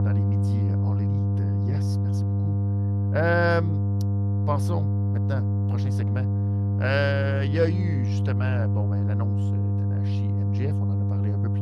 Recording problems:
electrical hum; loud; throughout; 50 Hz, 8 dB below the speech

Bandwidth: 15 kHz